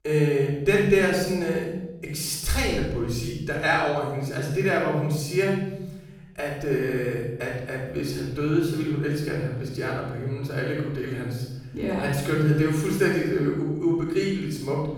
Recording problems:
off-mic speech; far
room echo; noticeable; dies away in 1.5 s

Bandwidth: 18 kHz